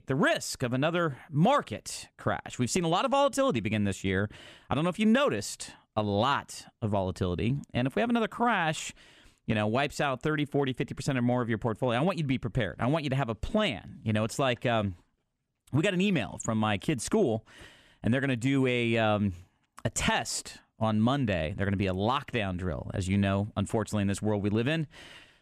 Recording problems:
none

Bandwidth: 13.5 kHz